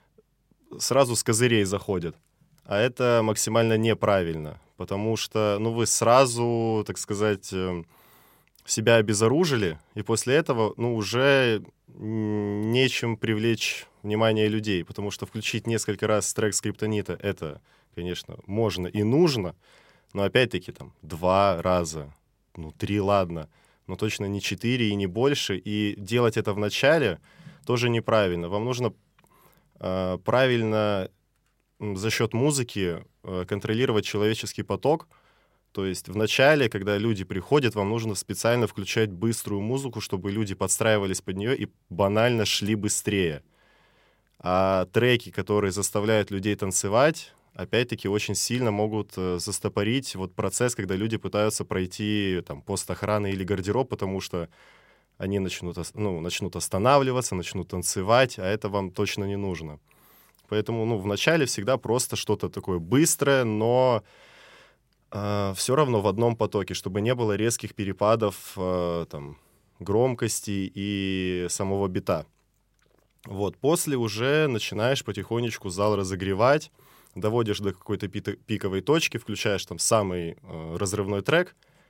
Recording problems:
none

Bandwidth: 16 kHz